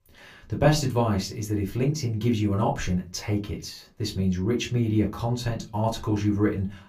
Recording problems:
room echo; very slight; dies away in 0.2 s
off-mic speech; somewhat distant

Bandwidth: 15 kHz